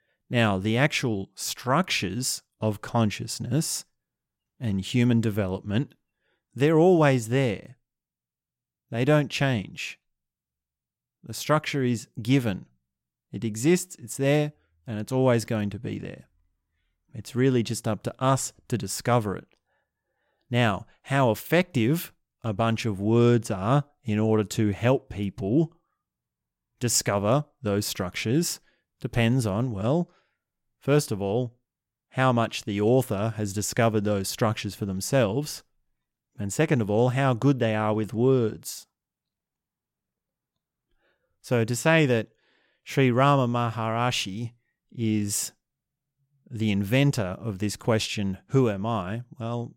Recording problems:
none

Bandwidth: 16.5 kHz